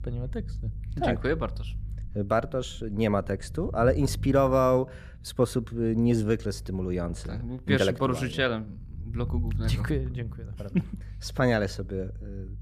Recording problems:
low rumble; faint; throughout; 25 dB below the speech

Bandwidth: 14.5 kHz